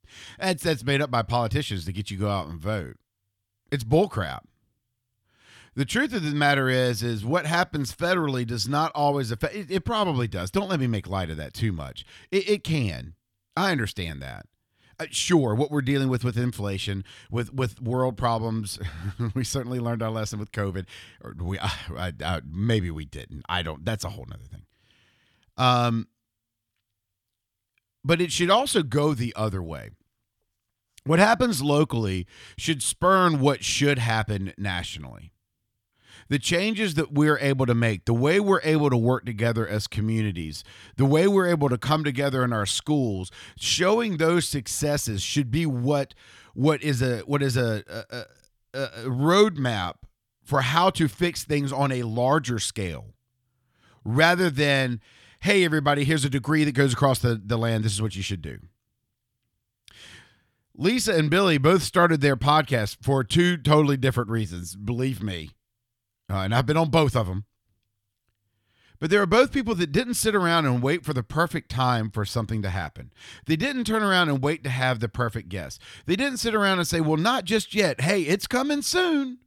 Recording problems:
none

